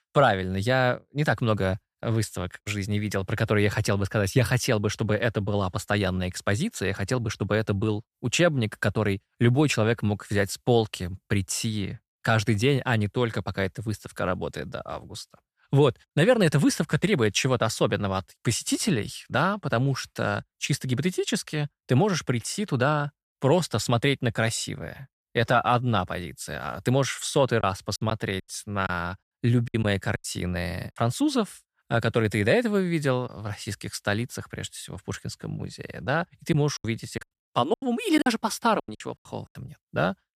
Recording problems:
choppy; very; from 28 to 30 s and from 37 to 39 s; 13% of the speech affected

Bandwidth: 14.5 kHz